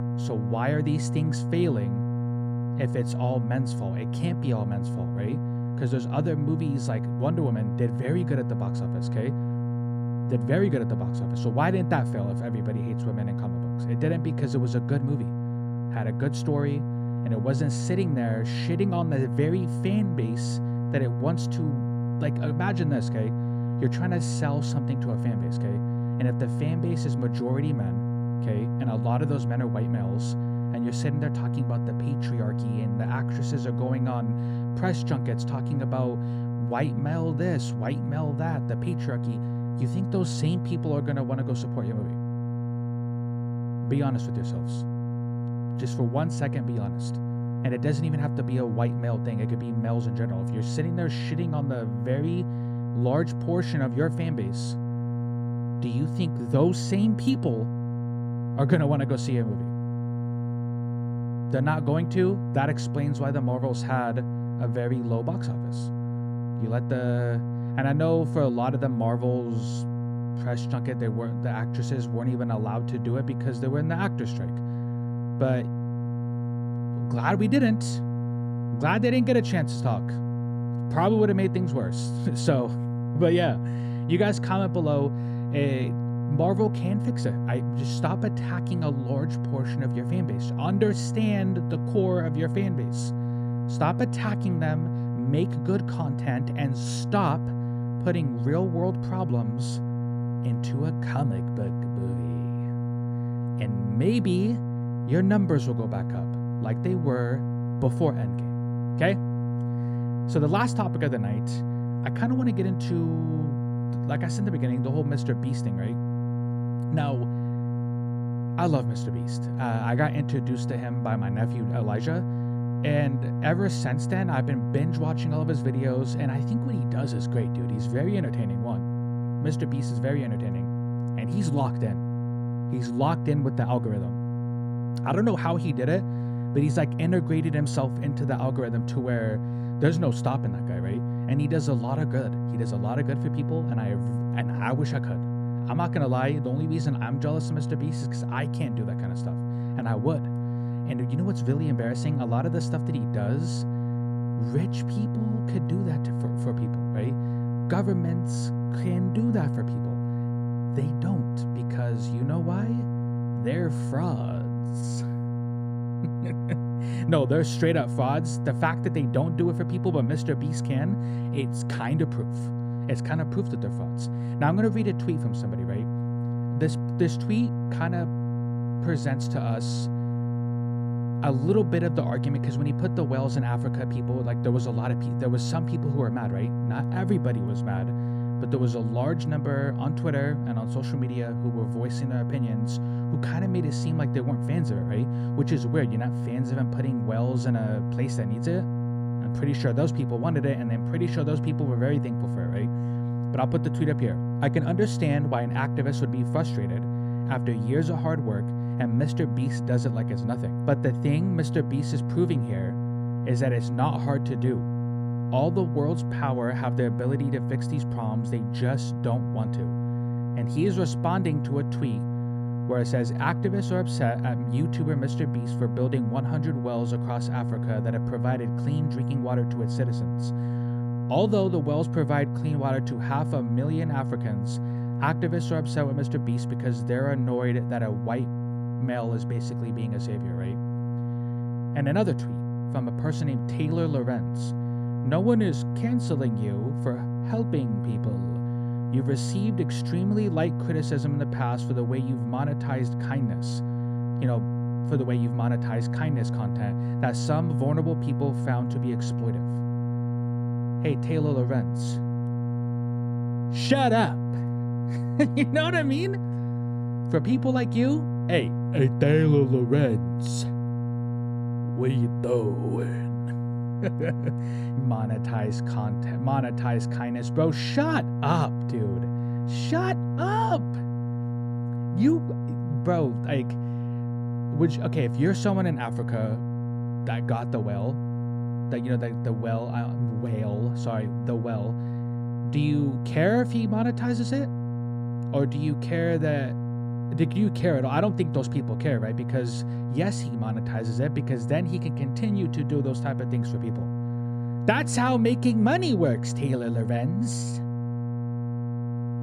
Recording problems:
electrical hum; loud; throughout; 60 Hz, 6 dB below the speech

